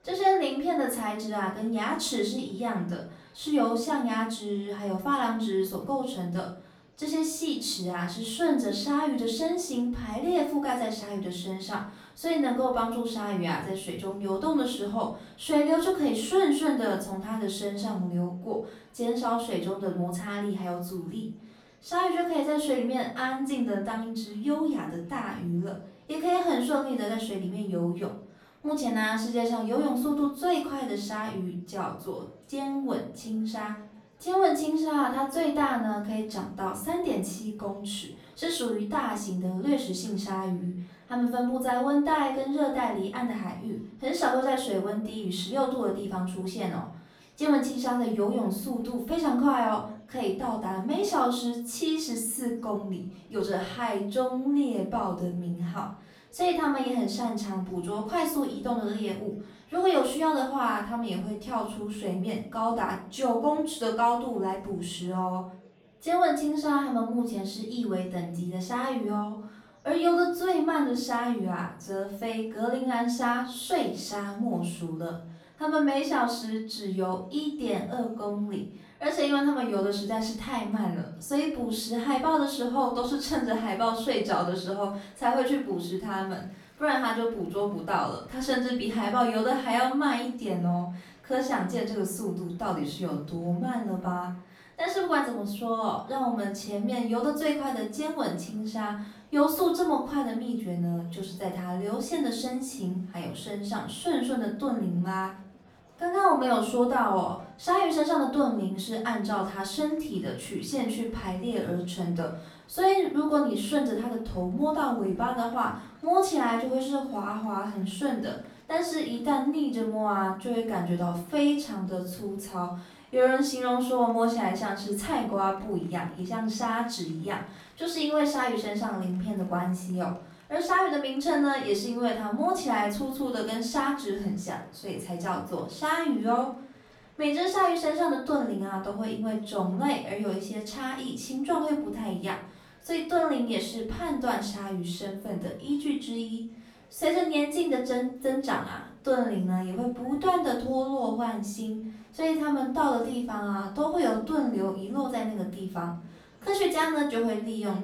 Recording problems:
off-mic speech; far
room echo; noticeable; dies away in 0.4 s
murmuring crowd; faint; throughout; 30 dB below the speech

